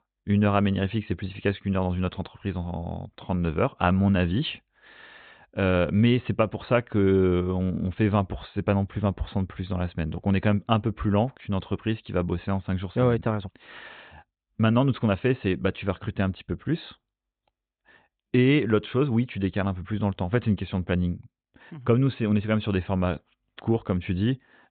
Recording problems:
high frequencies cut off; severe; nothing above 4 kHz

